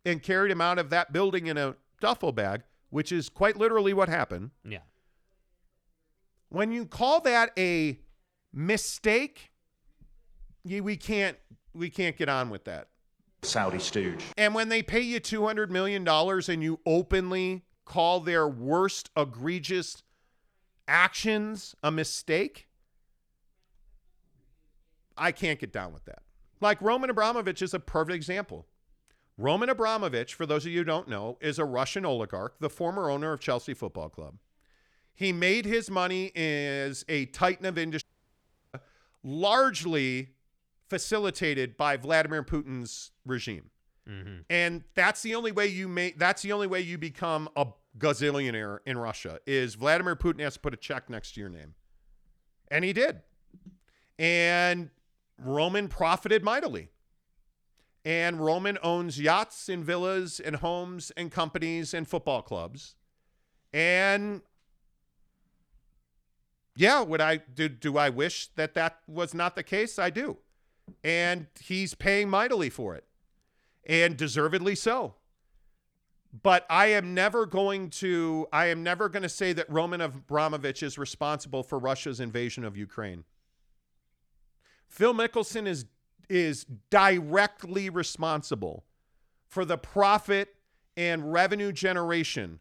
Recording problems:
audio cutting out; at 38 s for 0.5 s

